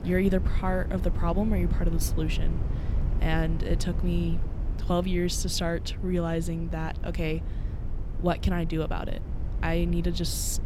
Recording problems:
low rumble; noticeable; throughout; 15 dB below the speech

